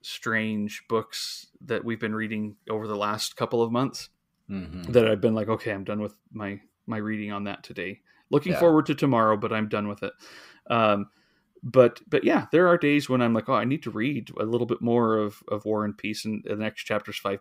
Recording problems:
none

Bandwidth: 15.5 kHz